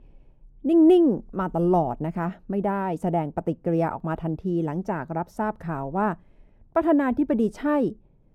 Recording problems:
muffled; very; fading above 1.5 kHz

